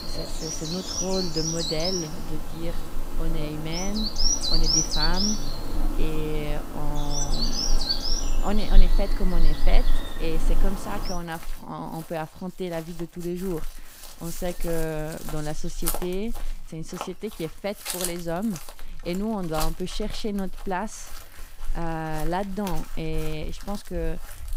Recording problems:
animal sounds; very loud; throughout; 3 dB above the speech

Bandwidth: 15.5 kHz